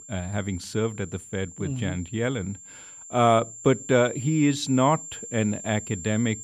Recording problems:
high-pitched whine; noticeable; throughout; 7.5 kHz, 15 dB below the speech

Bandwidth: 15 kHz